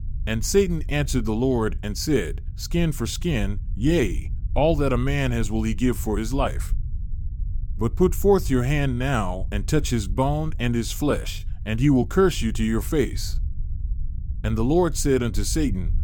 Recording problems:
low rumble; faint; throughout; 25 dB below the speech

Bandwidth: 17 kHz